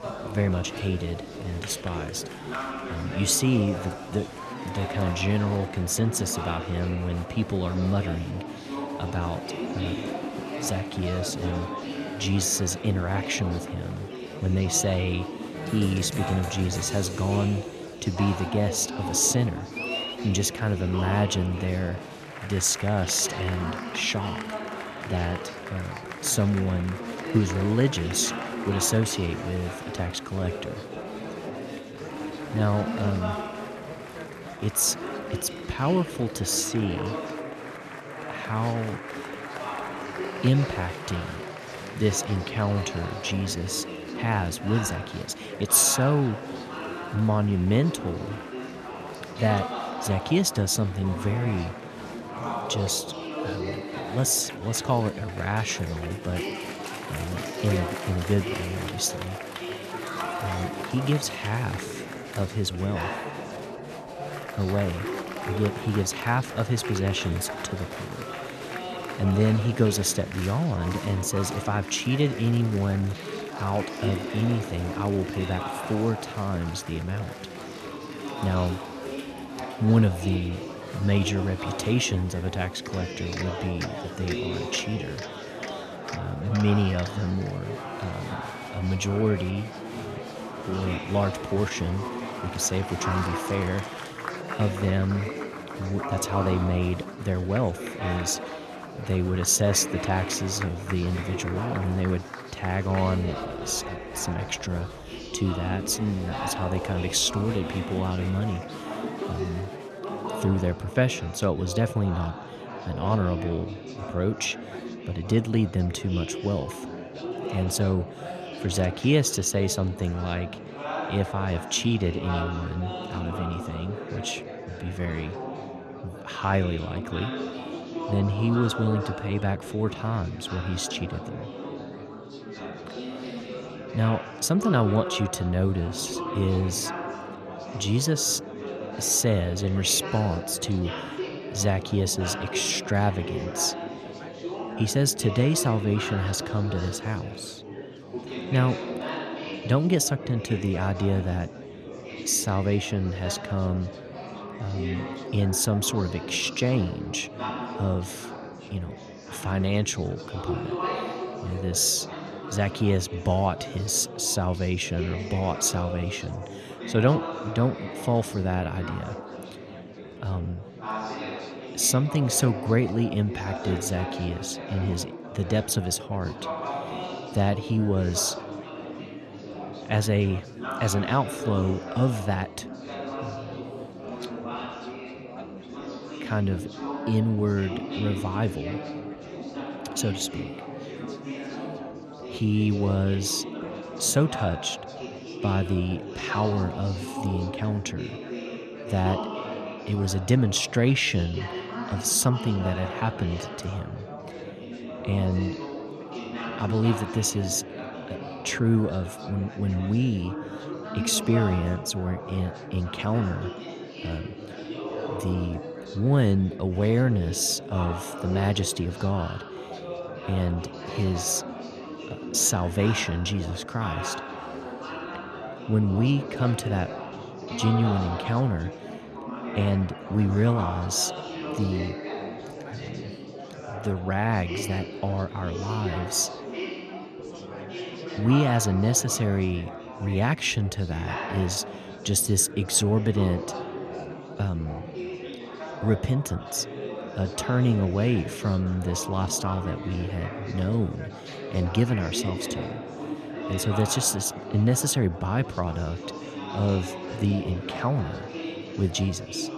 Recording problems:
murmuring crowd; loud; throughout; 8 dB below the speech

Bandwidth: 13.5 kHz